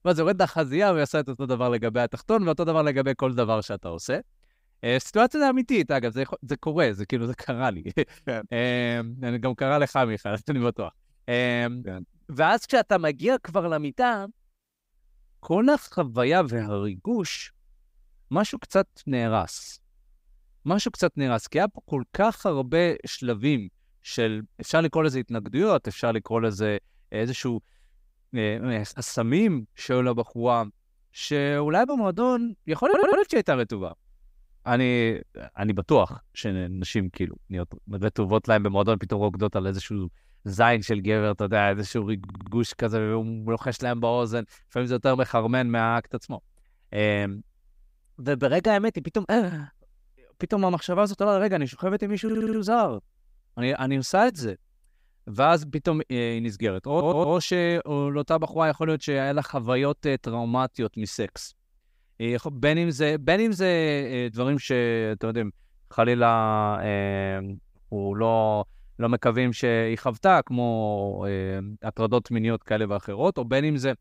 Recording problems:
audio stuttering; 4 times, first at 33 s

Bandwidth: 15.5 kHz